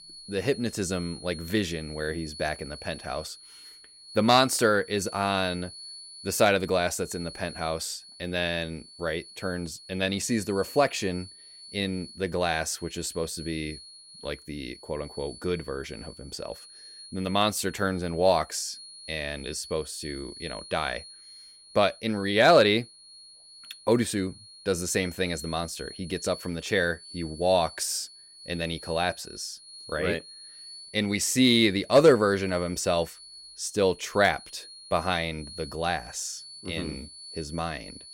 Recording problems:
high-pitched whine; noticeable; throughout; 4.5 kHz, 15 dB below the speech

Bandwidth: 16 kHz